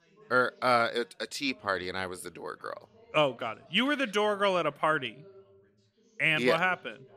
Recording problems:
background chatter; faint; throughout; 2 voices, 30 dB below the speech

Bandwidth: 15 kHz